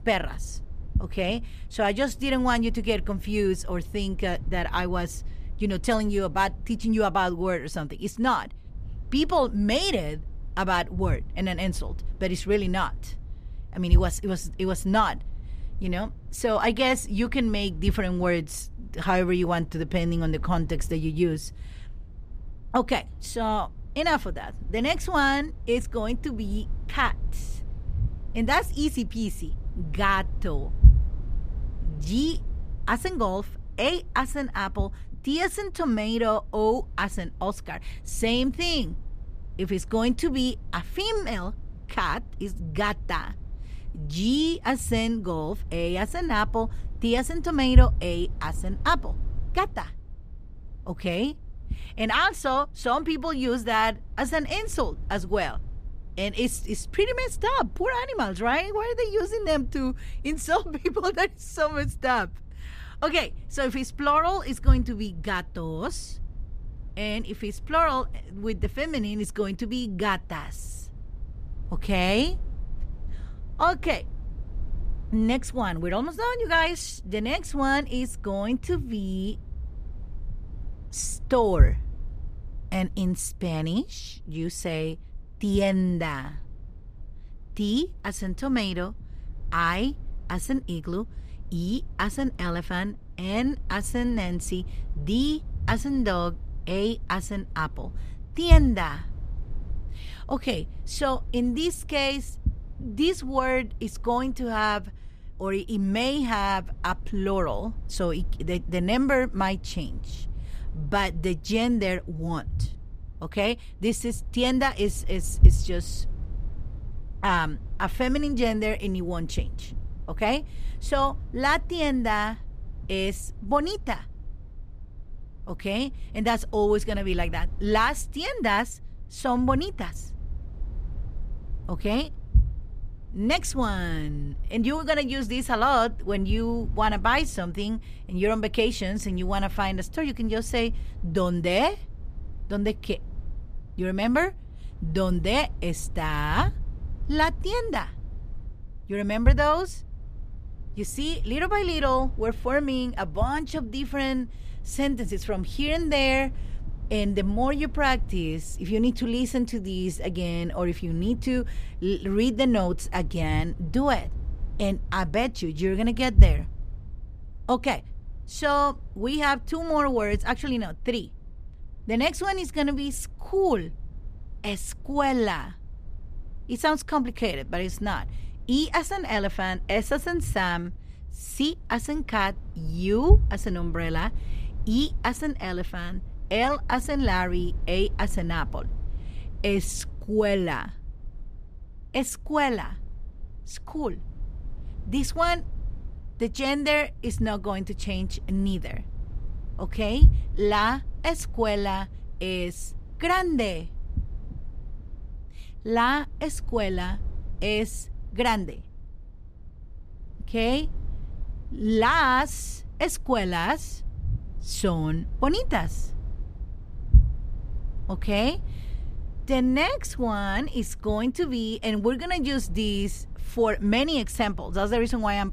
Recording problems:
low rumble; faint; throughout; 25 dB below the speech

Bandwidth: 14.5 kHz